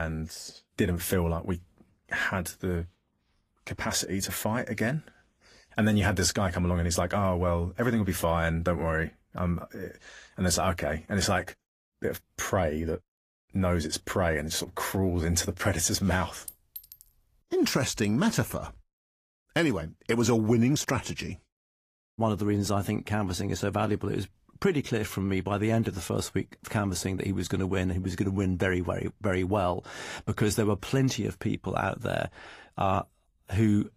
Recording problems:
garbled, watery; slightly; nothing above 15.5 kHz
abrupt cut into speech; at the start
clattering dishes; faint; at 16 s; peak 15 dB below the speech

